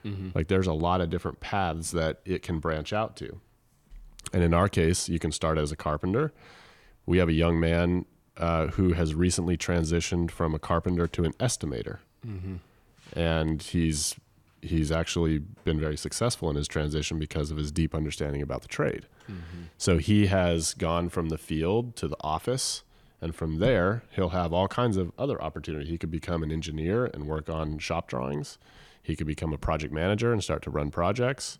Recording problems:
none

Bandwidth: 18 kHz